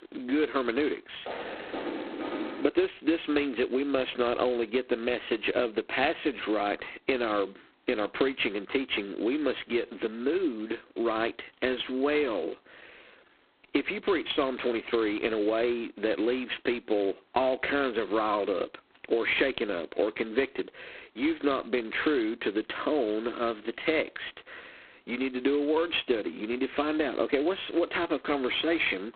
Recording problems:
phone-call audio; poor line; nothing above 4 kHz
squashed, flat; somewhat
door banging; noticeable; from 1.5 to 2.5 s; peak 5 dB below the speech

